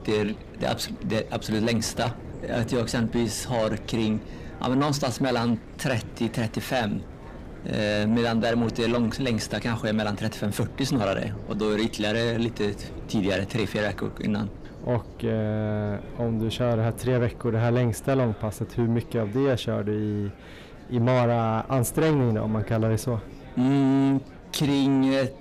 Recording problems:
distortion; slight; 10 dB below the speech
wind noise on the microphone; occasional gusts; 20 dB below the speech
chatter from many people; faint; throughout; 25 dB below the speech

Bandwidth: 14.5 kHz